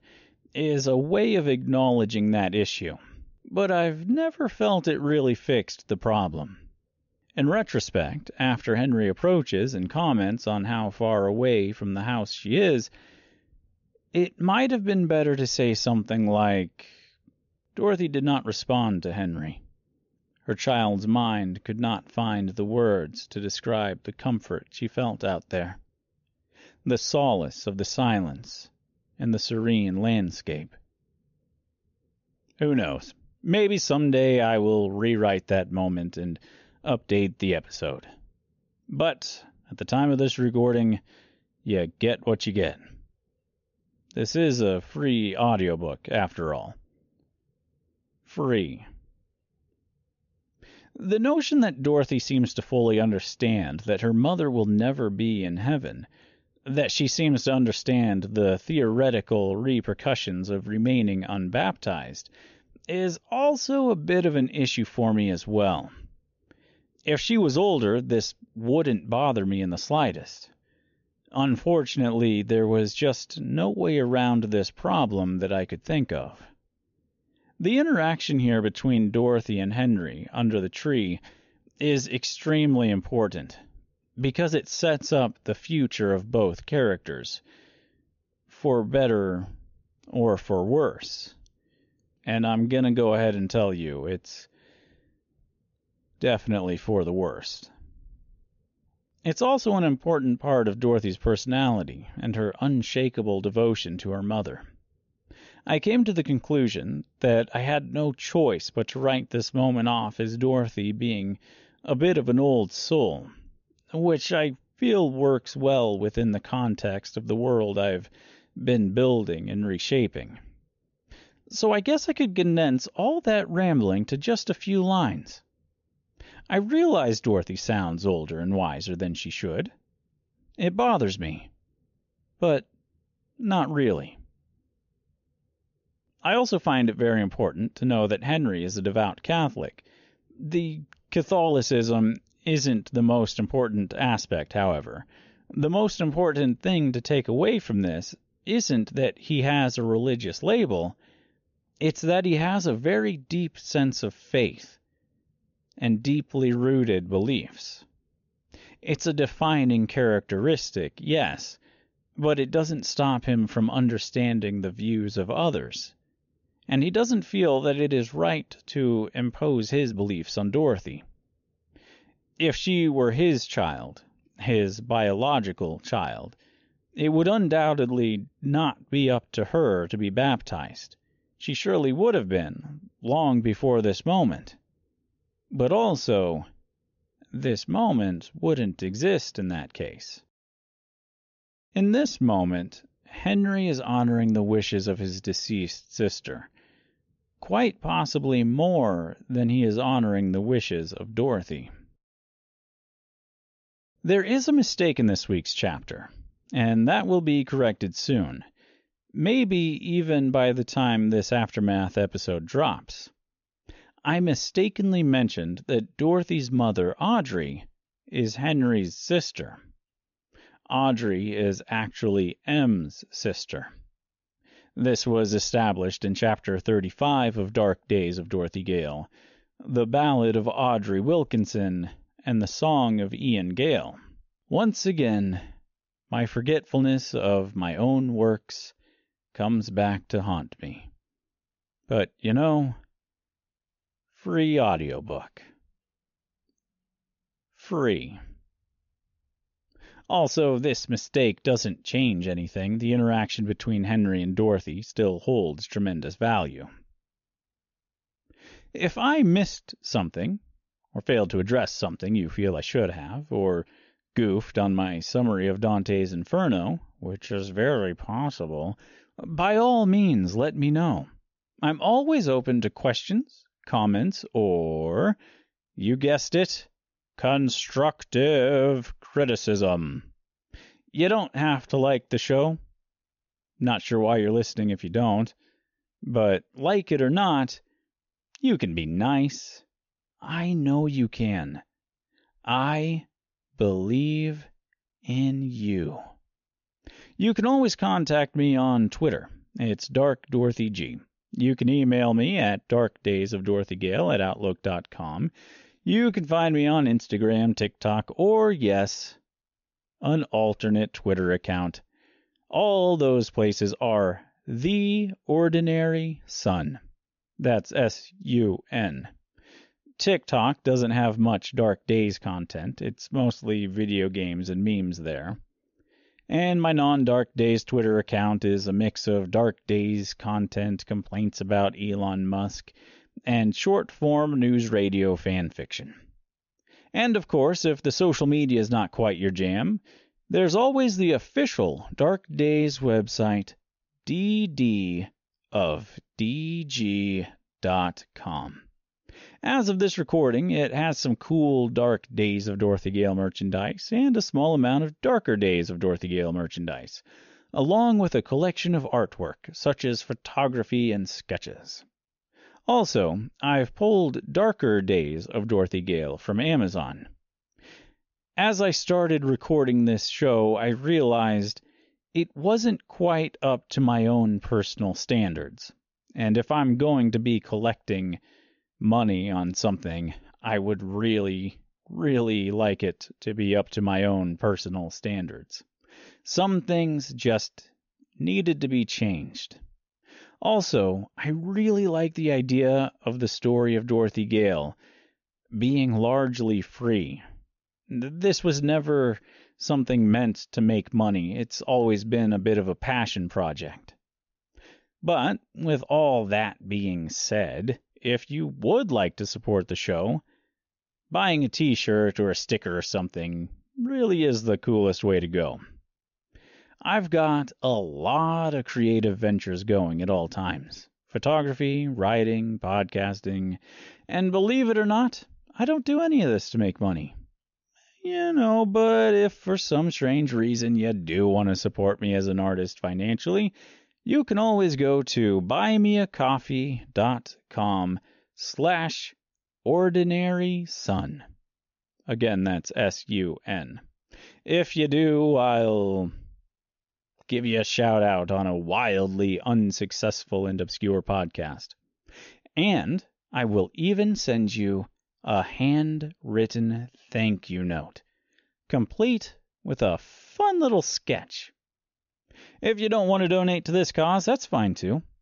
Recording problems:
high frequencies cut off; noticeable; nothing above 7 kHz
uneven, jittery; strongly; from 2:50 to 7:38

